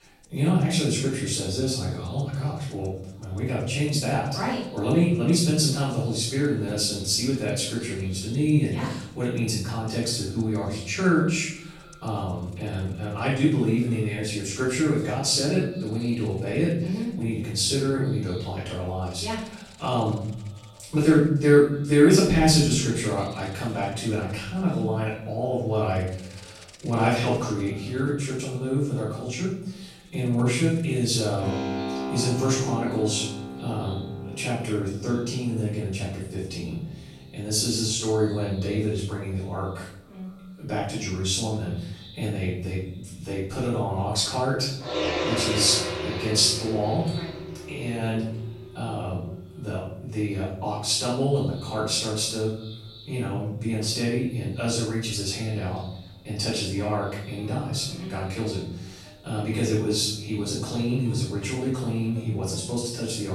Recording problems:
off-mic speech; far
room echo; noticeable; dies away in 0.7 s
echo of what is said; faint; throughout; 220 ms later, 25 dB below the speech
background music; noticeable; throughout; 10 dB below the speech
abrupt cut into speech; at the end

